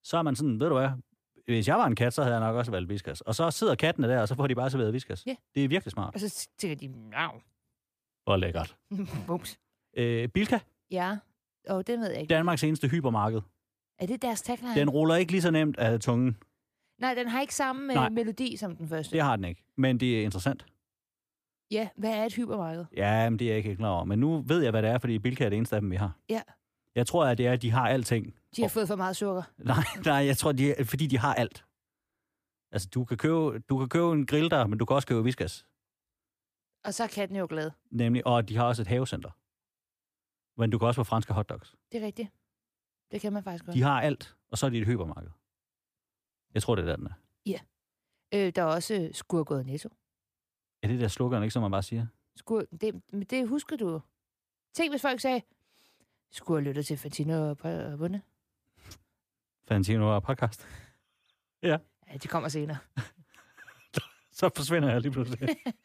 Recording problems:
none

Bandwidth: 15 kHz